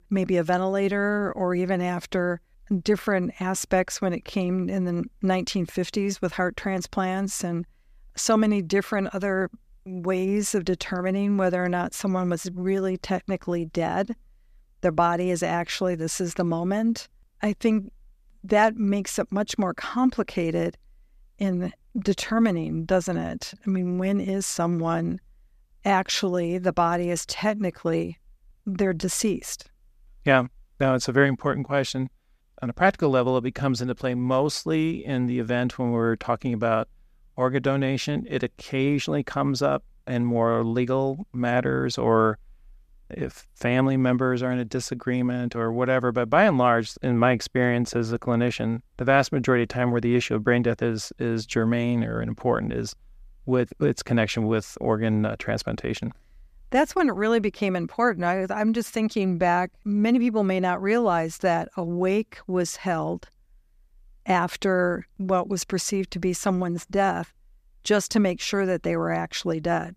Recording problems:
none

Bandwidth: 14.5 kHz